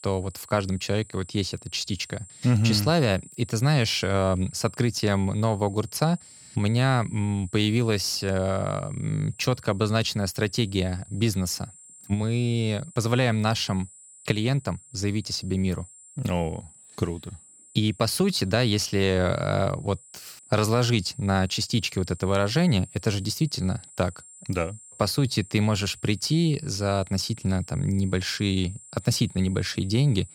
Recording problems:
high-pitched whine; faint; throughout; 7.5 kHz, 20 dB below the speech

